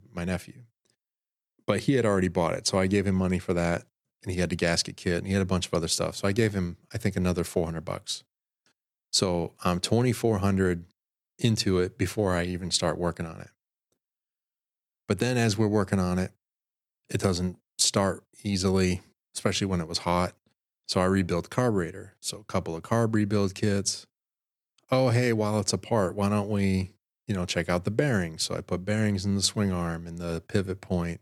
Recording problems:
none

